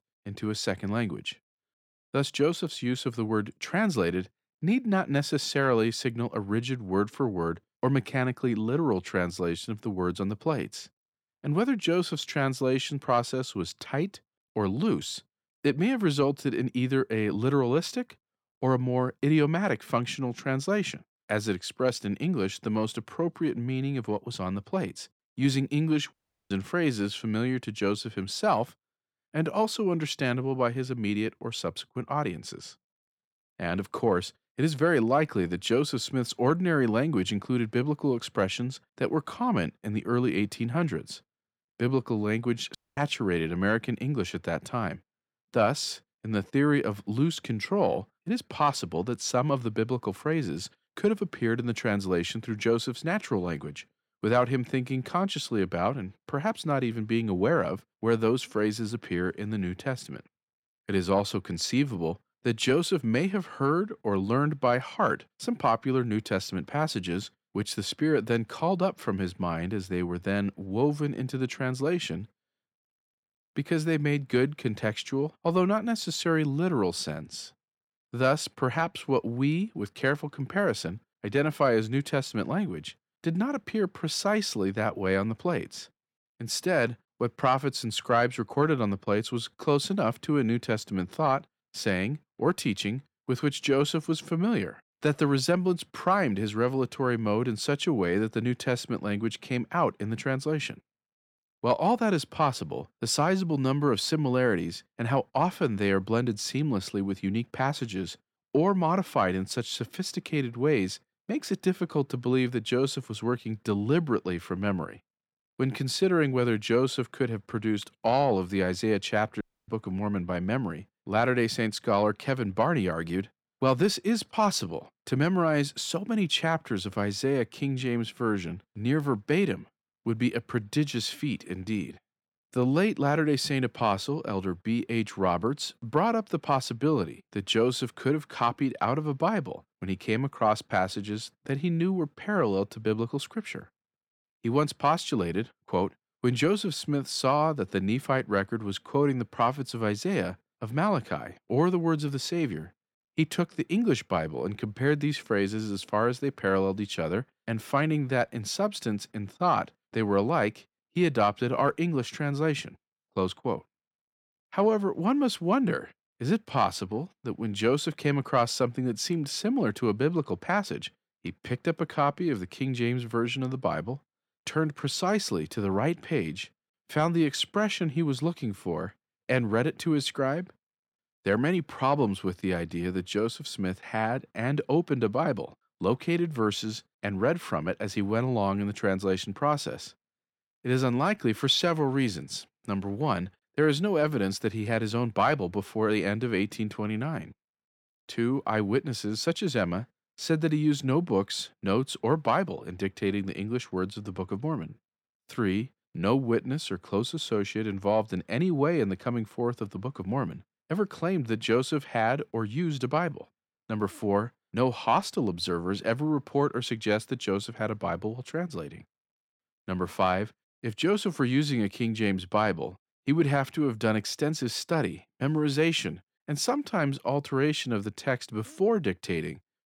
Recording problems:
audio cutting out; at 26 s, at 43 s and at 1:59

